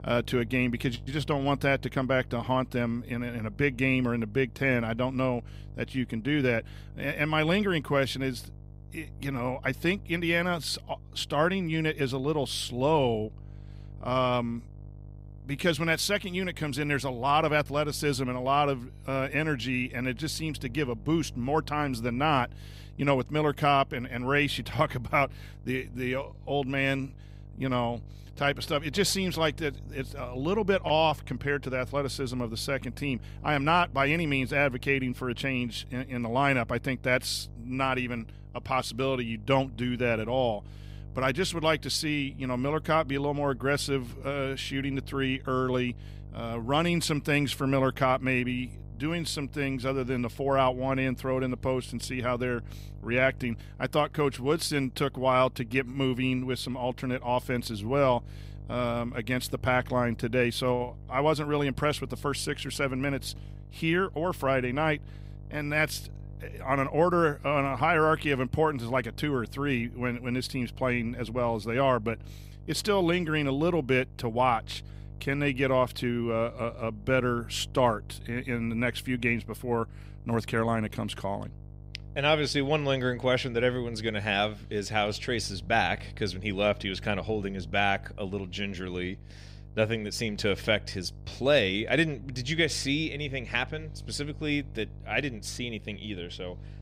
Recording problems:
electrical hum; faint; throughout; 50 Hz, 30 dB below the speech

